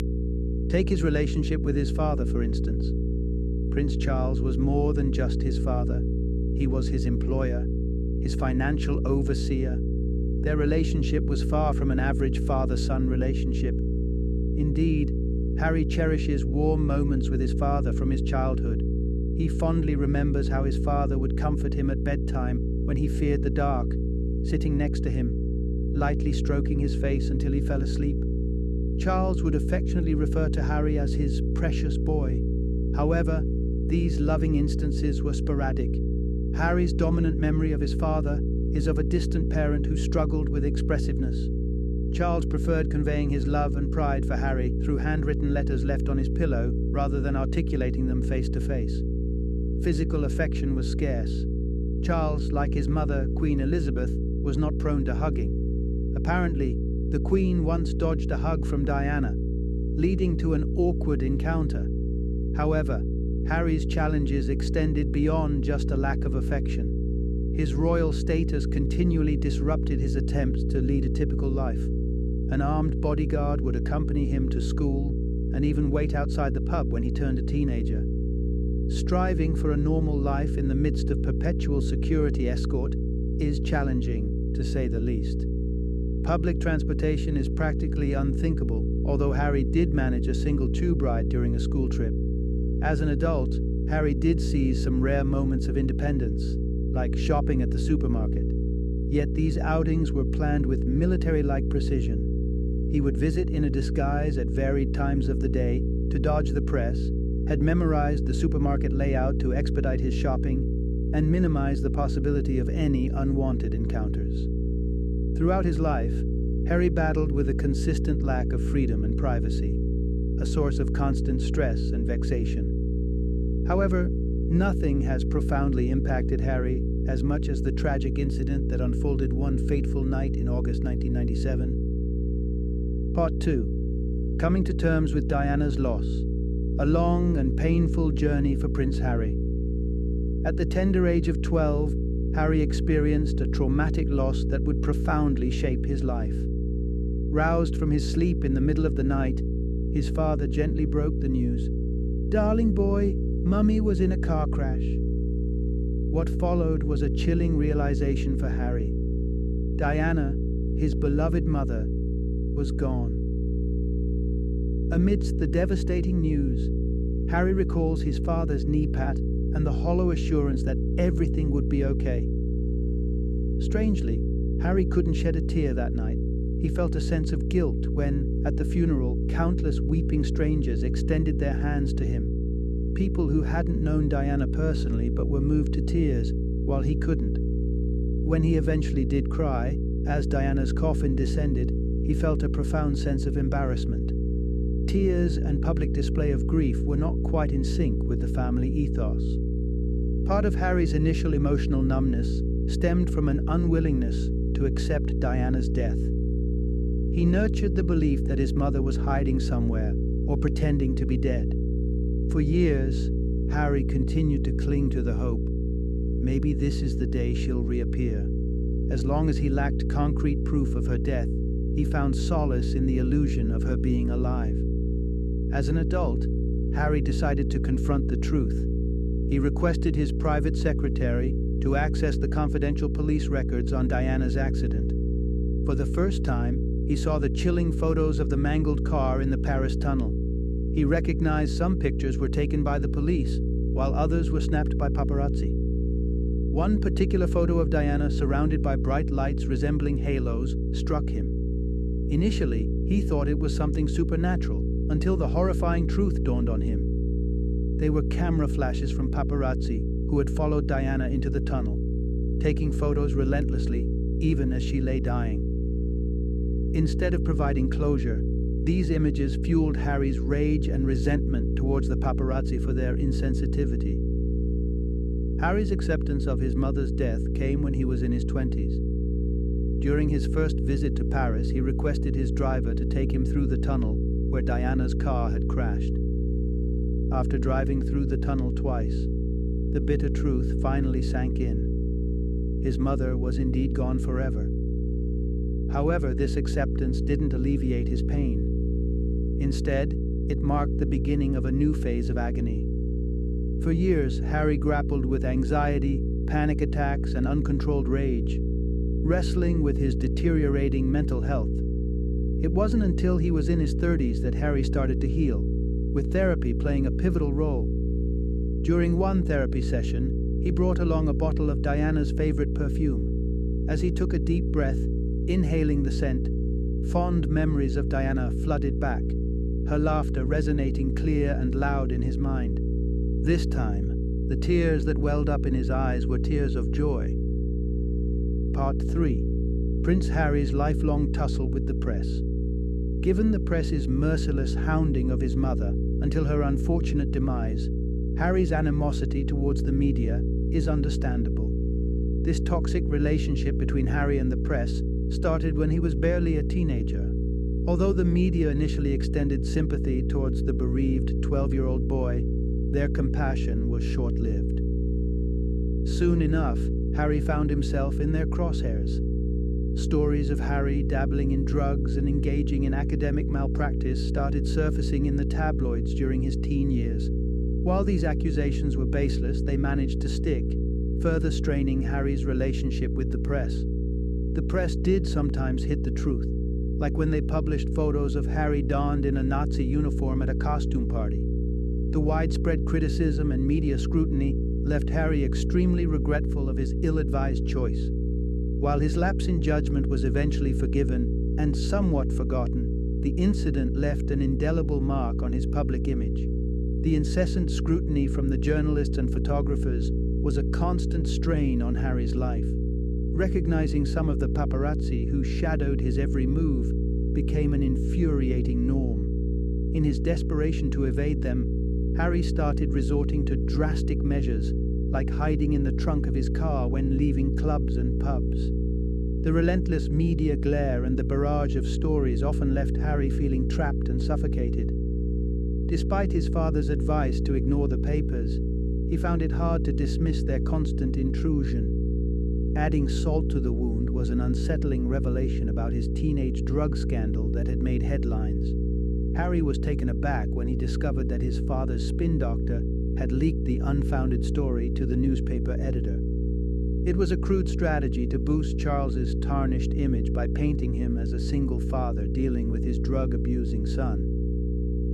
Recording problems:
electrical hum; loud; throughout; 60 Hz, 5 dB below the speech

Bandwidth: 13.5 kHz